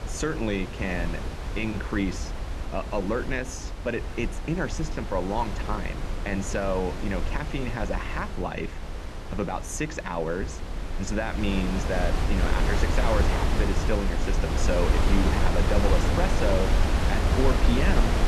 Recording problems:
wind noise on the microphone; heavy; 2 dB below the speech

